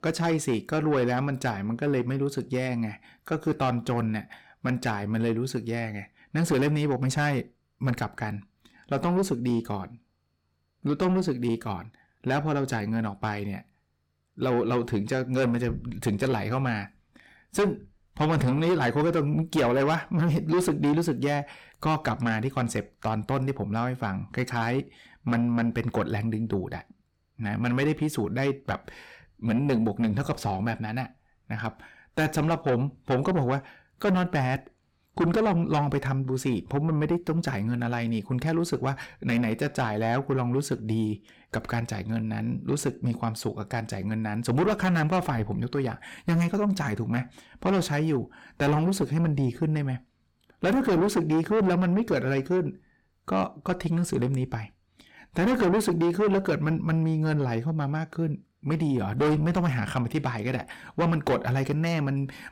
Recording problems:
distortion; heavy; 6 dB below the speech

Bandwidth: 17.5 kHz